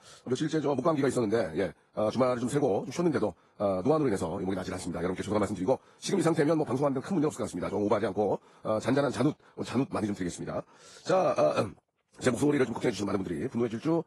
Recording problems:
wrong speed, natural pitch; too fast; 1.8 times normal speed
garbled, watery; slightly; nothing above 11 kHz

